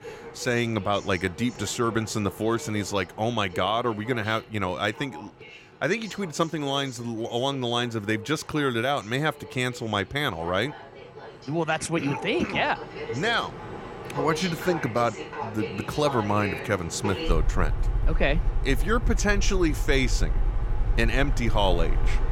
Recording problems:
train or aircraft noise; loud; throughout; 6 dB below the speech

